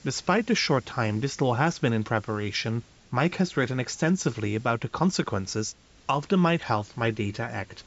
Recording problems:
high frequencies cut off; noticeable; nothing above 8 kHz
hiss; faint; throughout; 25 dB below the speech

